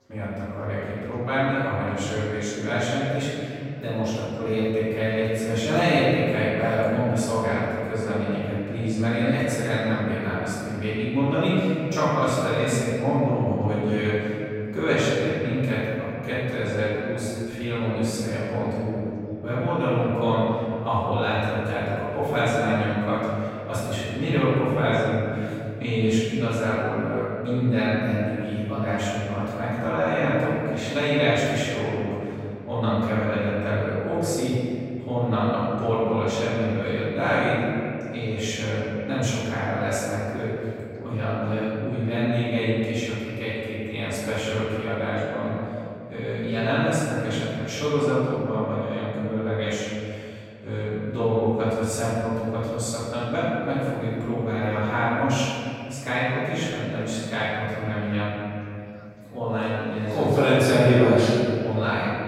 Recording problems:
room echo; strong; dies away in 2.6 s
off-mic speech; far
chatter from many people; faint; throughout; 30 dB below the speech

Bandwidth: 16.5 kHz